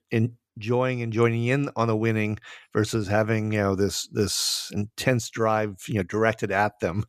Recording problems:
none

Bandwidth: 14.5 kHz